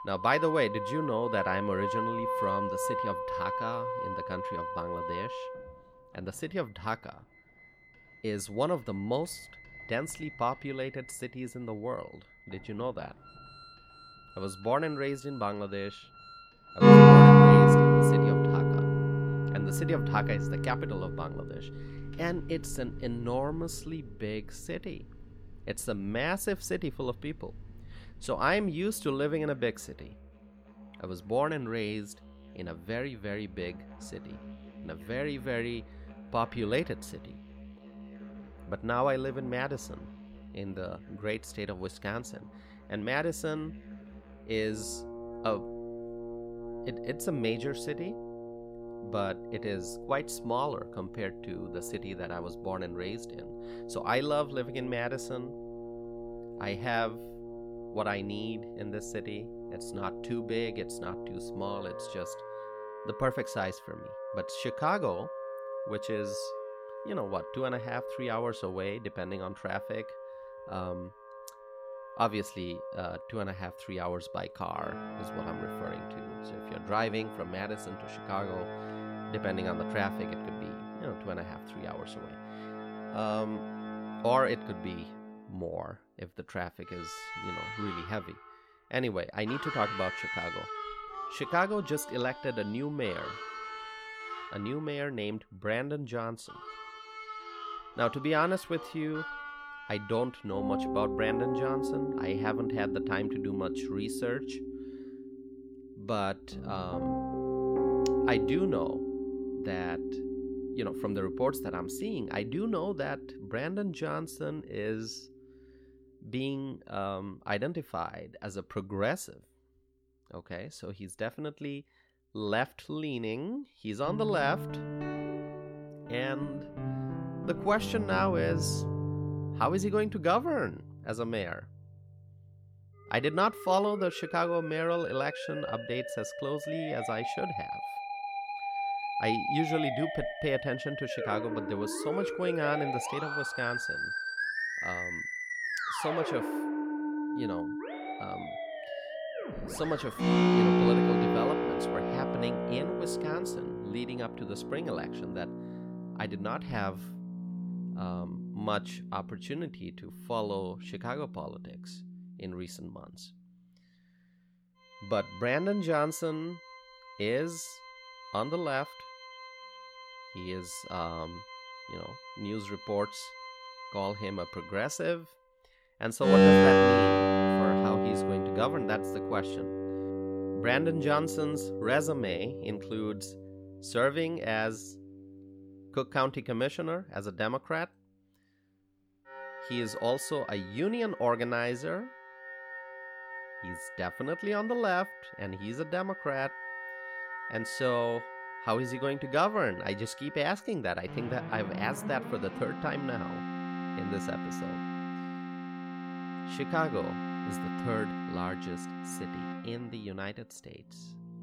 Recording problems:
background music; very loud; throughout; 4 dB above the speech

